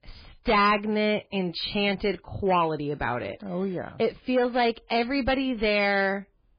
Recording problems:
distortion; heavy; 5% of the sound clipped
garbled, watery; badly; nothing above 4 kHz

